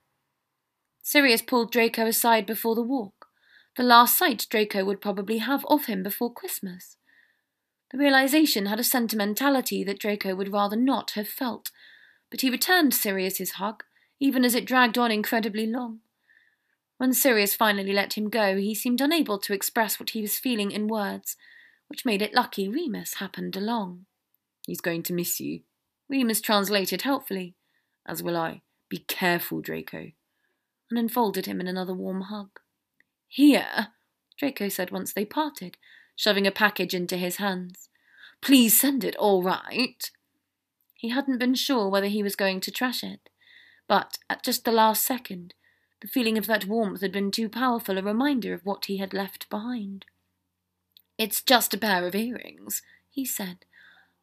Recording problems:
none

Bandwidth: 14.5 kHz